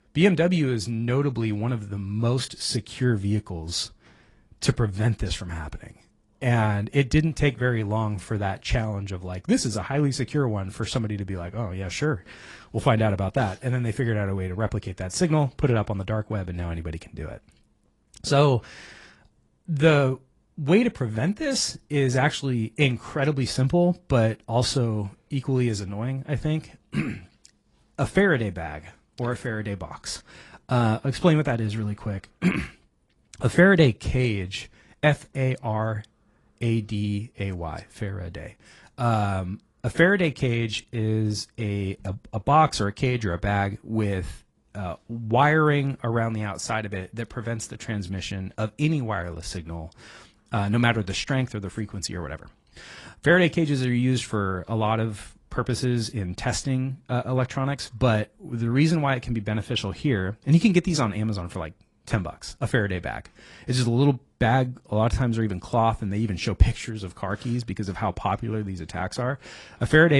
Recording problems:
garbled, watery; slightly; nothing above 10.5 kHz
abrupt cut into speech; at the end

